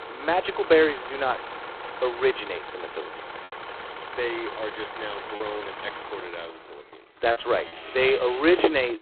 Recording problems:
phone-call audio; poor line; nothing above 4 kHz
traffic noise; loud; throughout; 9 dB below the speech
choppy; occasionally; from 5.5 to 7.5 s; 2% of the speech affected

